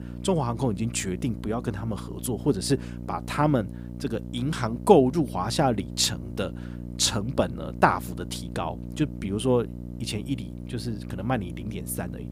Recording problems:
electrical hum; noticeable; throughout; 60 Hz, 20 dB below the speech

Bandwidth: 15.5 kHz